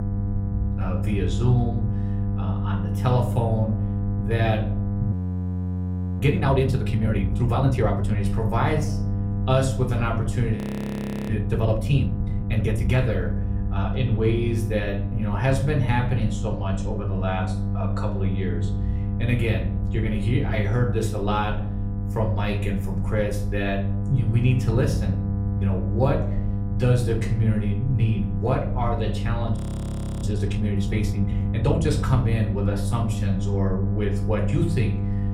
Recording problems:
room echo; slight; dies away in 0.4 s
off-mic speech; somewhat distant
electrical hum; loud; throughout; 50 Hz, 9 dB below the speech
low rumble; noticeable; throughout; 20 dB below the speech
audio freezing; at 5 s for 1 s, at 11 s for 0.5 s and at 30 s for 0.5 s

